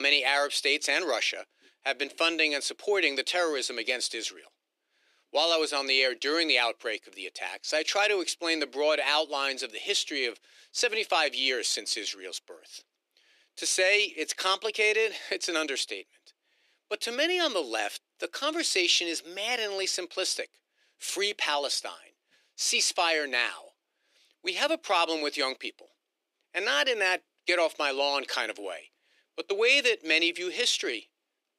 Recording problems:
thin; somewhat; fading below 300 Hz
abrupt cut into speech; at the start

